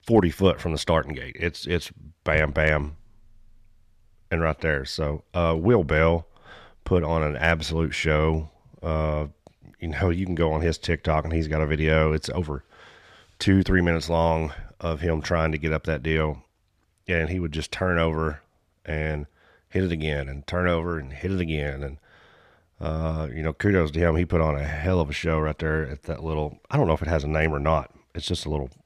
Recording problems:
none

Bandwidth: 14.5 kHz